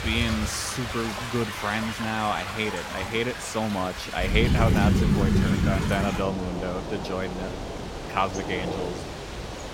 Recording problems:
rain or running water; very loud; throughout; 1 dB above the speech

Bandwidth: 16 kHz